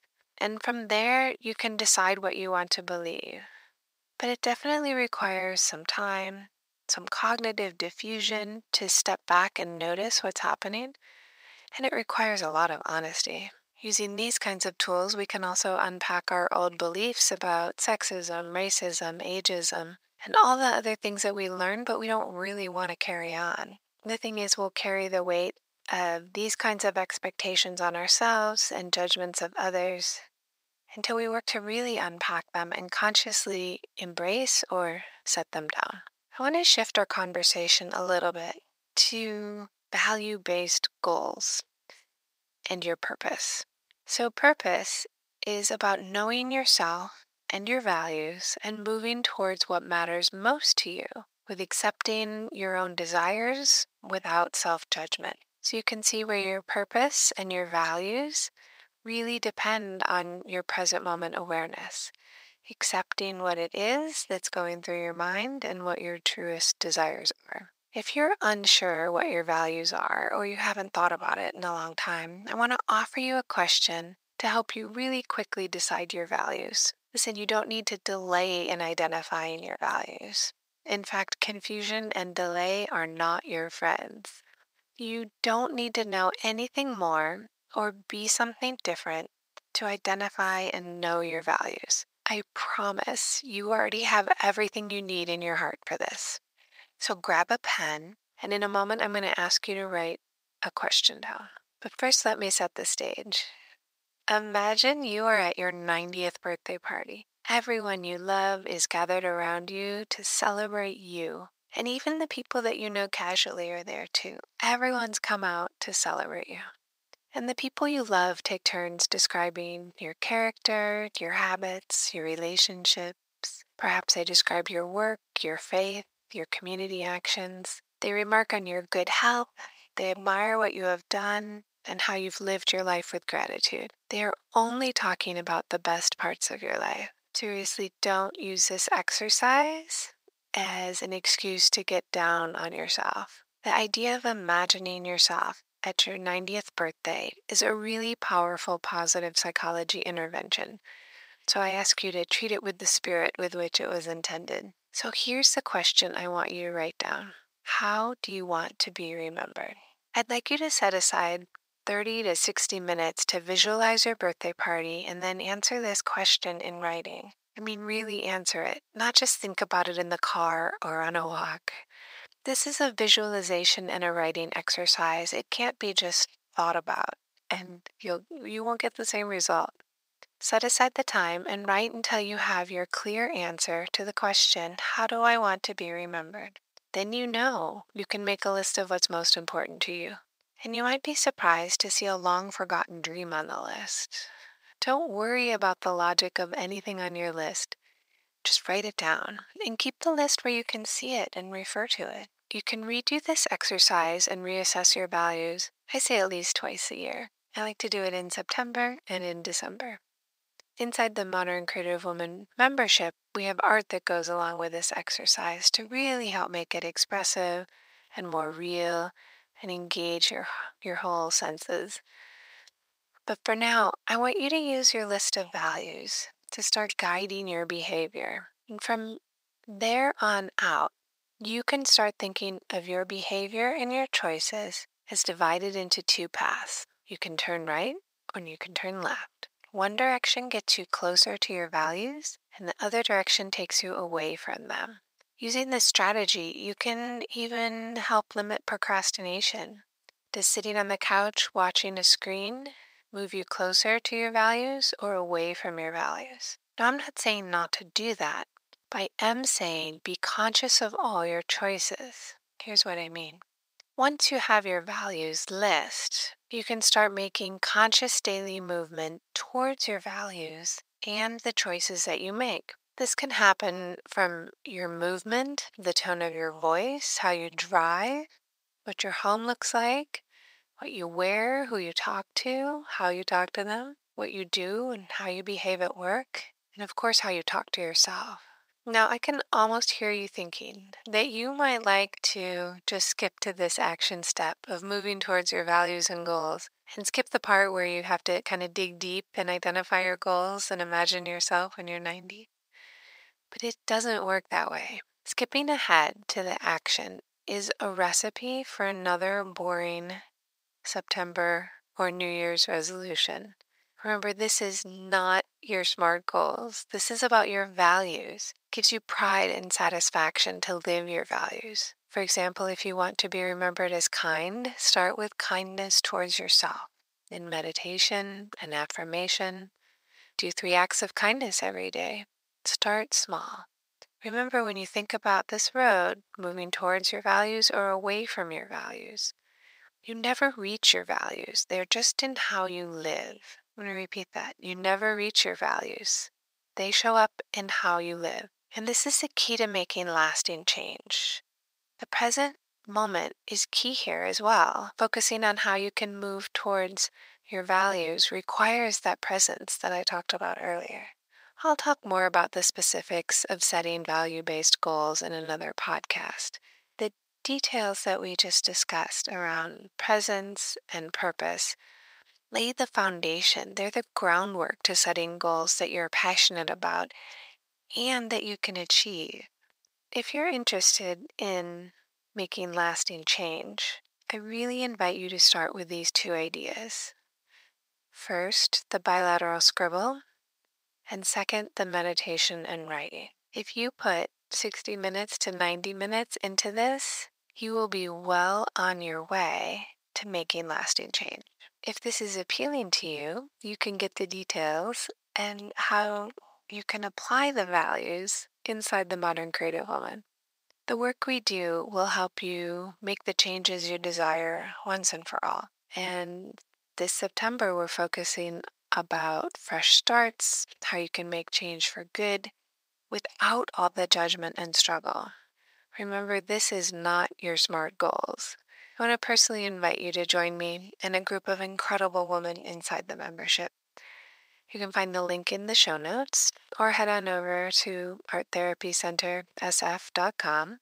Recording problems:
thin; very; fading below 800 Hz

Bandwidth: 15.5 kHz